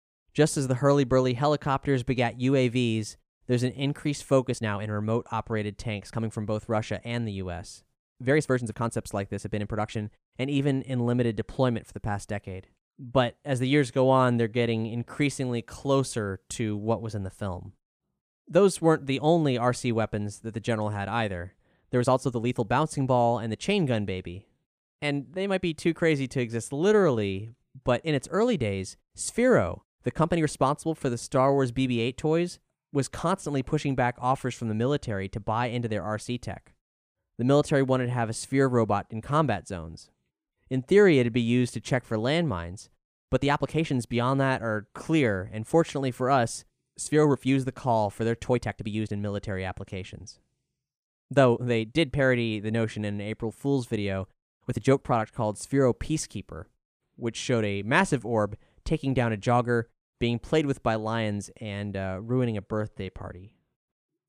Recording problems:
uneven, jittery; strongly; from 4.5 s to 1:03

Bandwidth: 15 kHz